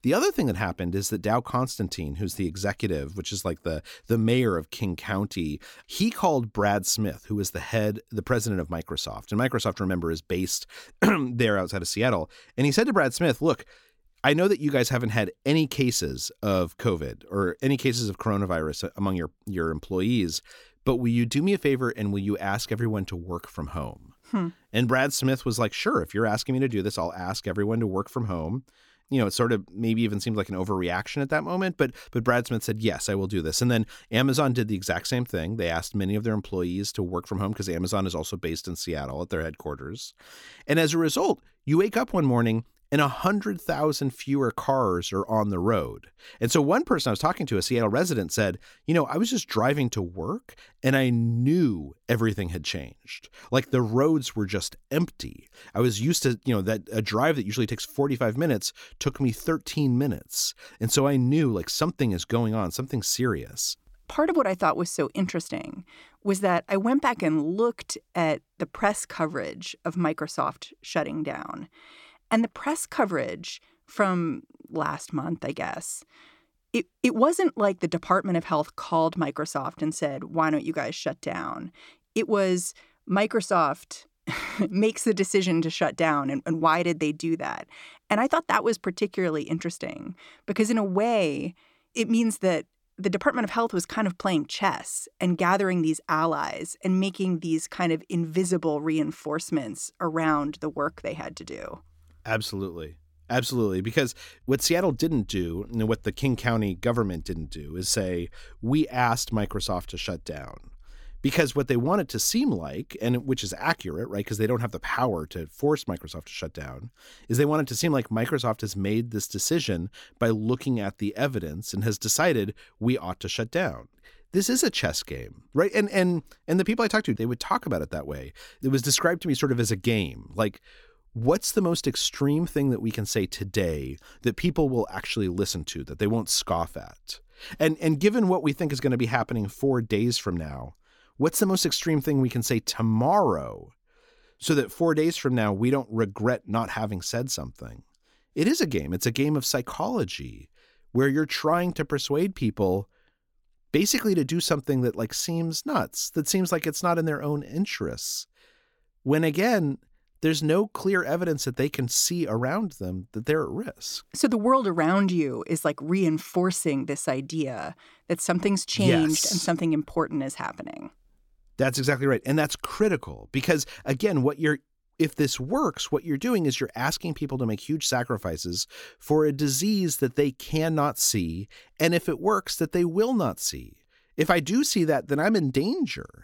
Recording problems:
none

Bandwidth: 17 kHz